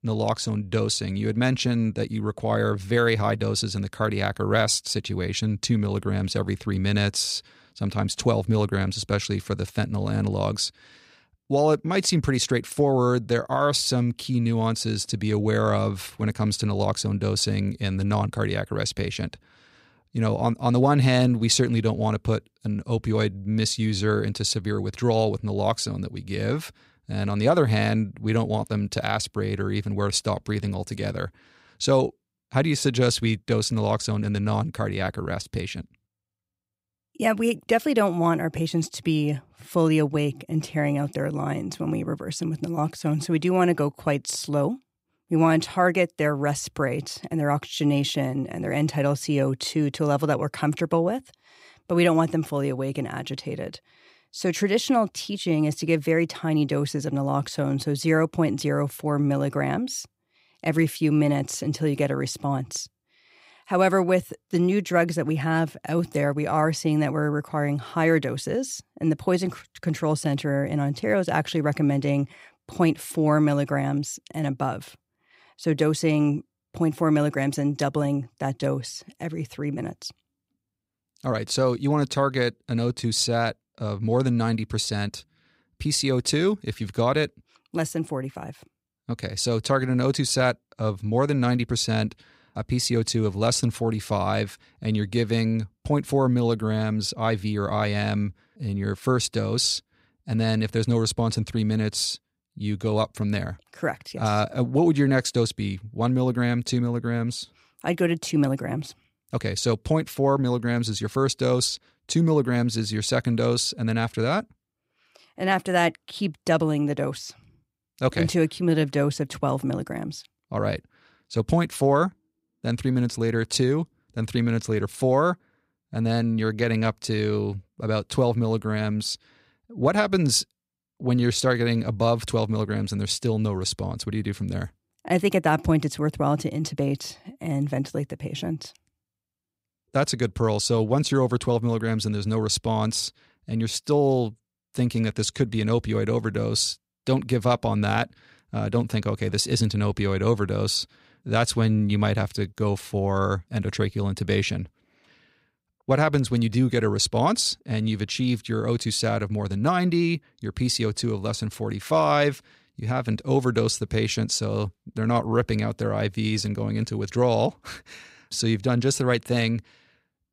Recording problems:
none

